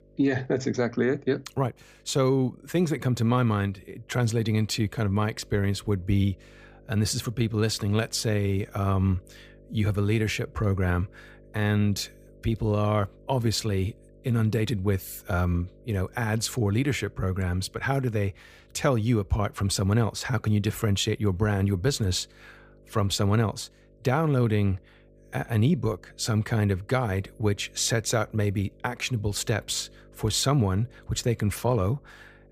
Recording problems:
electrical hum; faint; throughout; 50 Hz, 30 dB below the speech

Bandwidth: 15 kHz